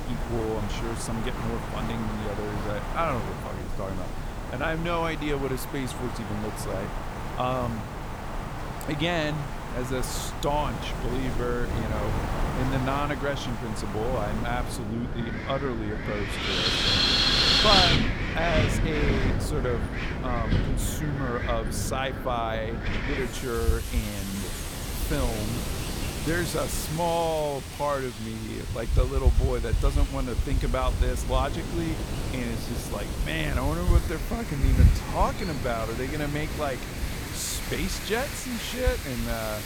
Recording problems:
wind in the background; very loud; throughout; 2 dB above the speech

